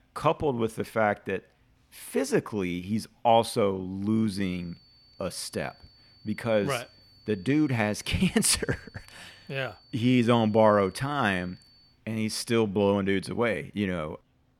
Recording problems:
high-pitched whine; faint; from 4.5 to 12 s; 4.5 kHz, 30 dB below the speech

